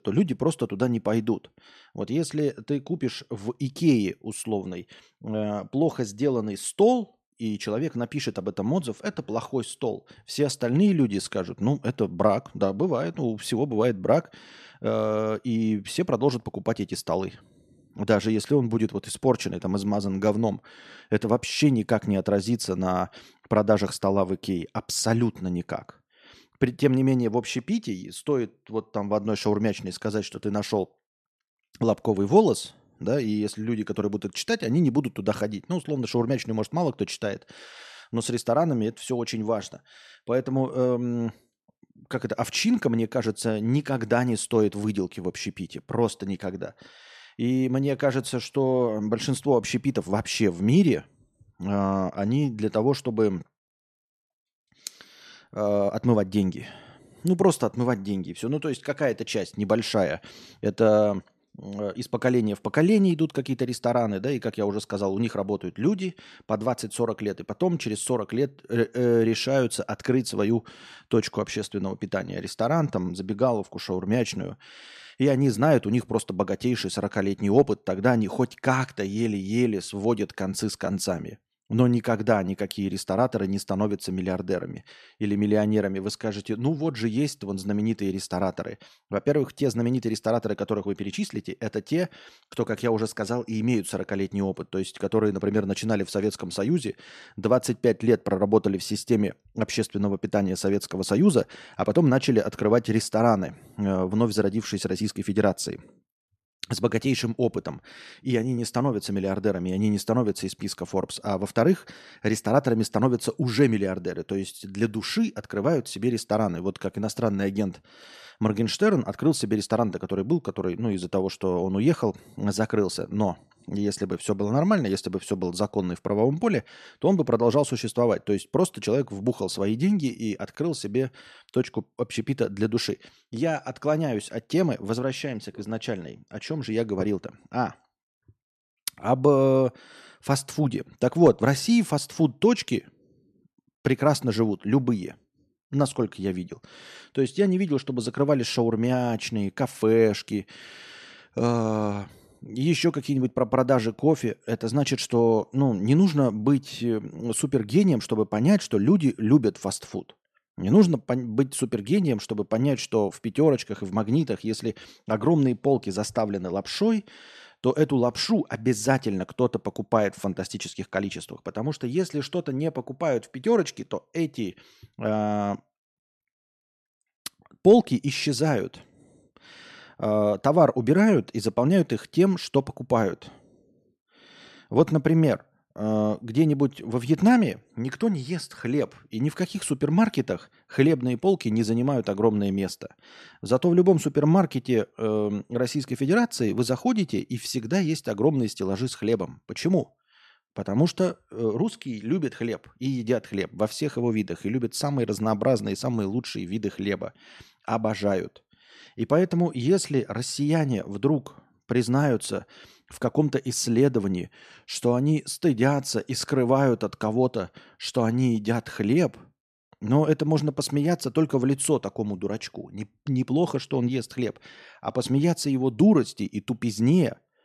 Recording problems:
none

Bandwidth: 13.5 kHz